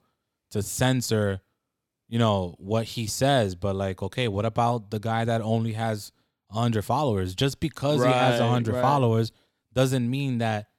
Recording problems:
none

